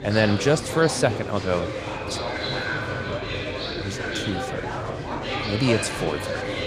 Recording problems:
murmuring crowd; loud; throughout; 3 dB below the speech

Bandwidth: 14.5 kHz